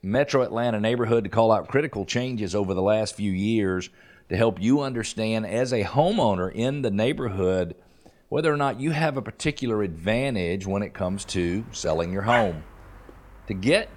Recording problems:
animal sounds; loud; throughout; 10 dB below the speech

